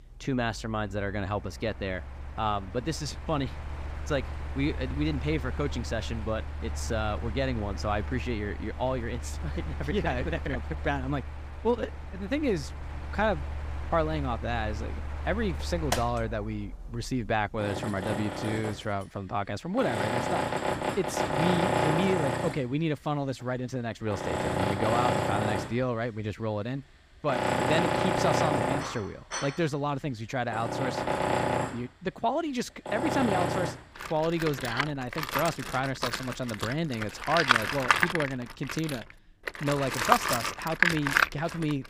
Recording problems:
machinery noise; very loud; throughout; as loud as the speech

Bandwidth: 15.5 kHz